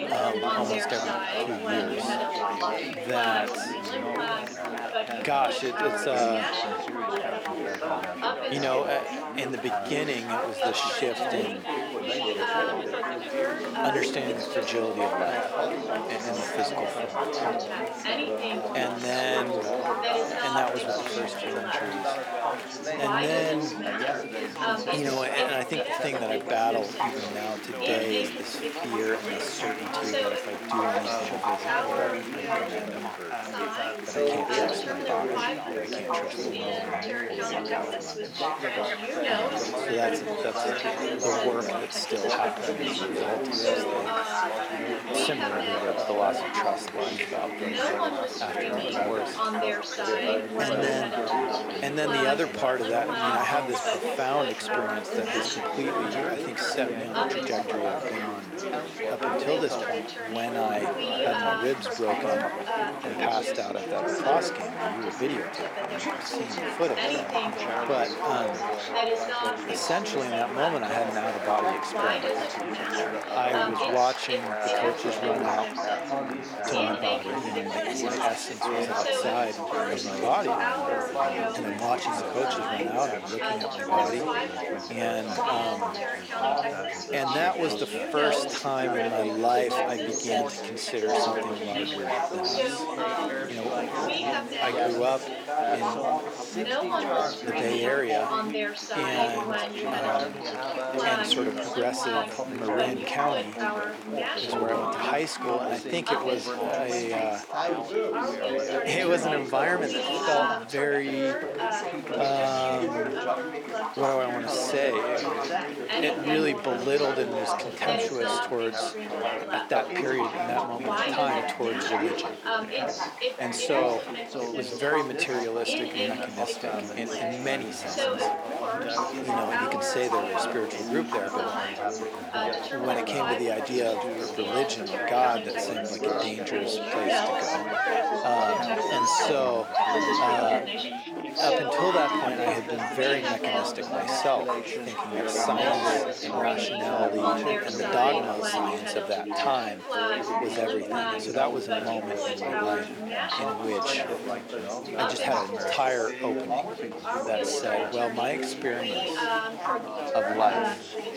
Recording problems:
thin; somewhat; fading below 350 Hz
chatter from many people; very loud; throughout; 2 dB above the speech

